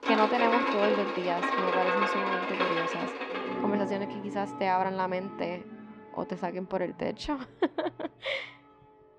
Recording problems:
muffled; slightly; fading above 3.5 kHz
background music; very loud; throughout; 1 dB above the speech

